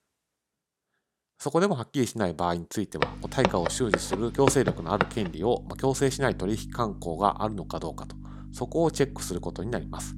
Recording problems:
electrical hum; faint; from 3 s on; 50 Hz, 20 dB below the speech
footsteps; loud; from 3 to 5 s; peak 1 dB above the speech

